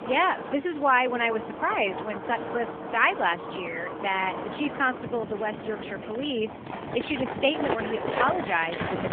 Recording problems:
phone-call audio; nothing above 3.5 kHz
wind in the background; loud; throughout; 7 dB below the speech

